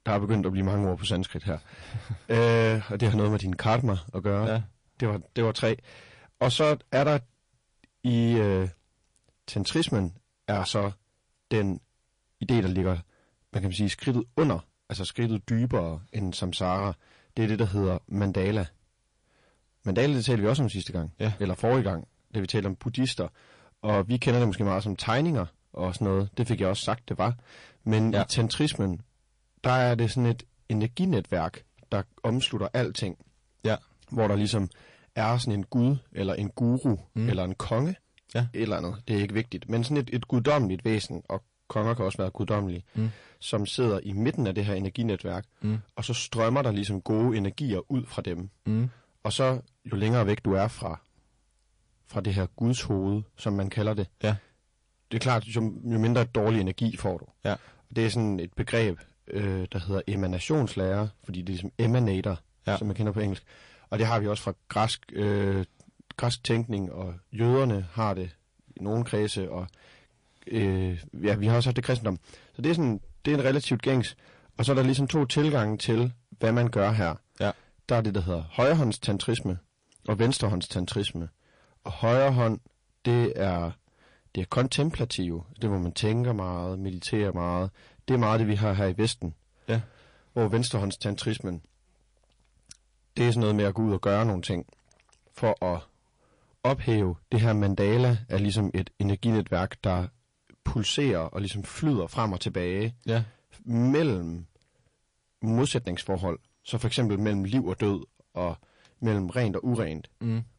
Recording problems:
distortion; slight; 10 dB below the speech
garbled, watery; slightly; nothing above 10.5 kHz

